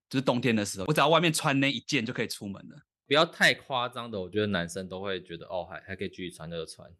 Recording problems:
none

